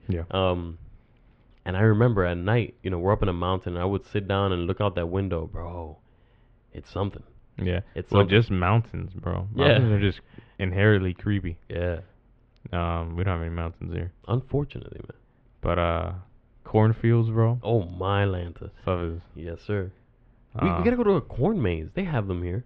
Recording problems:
muffled; very; fading above 3 kHz

